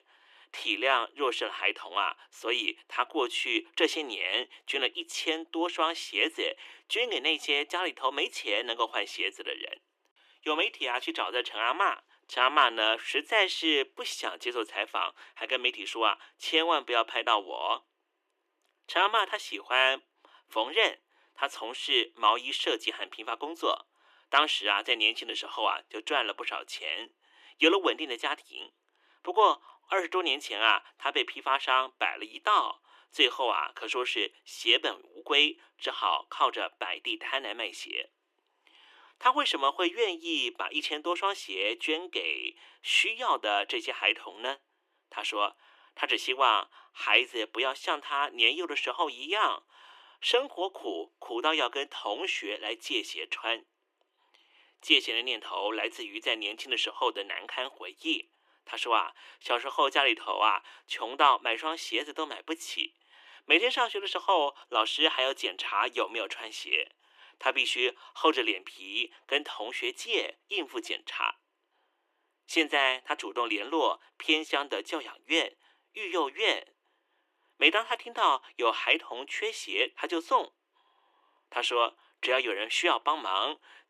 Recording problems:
thin; very; fading below 300 Hz

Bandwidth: 14.5 kHz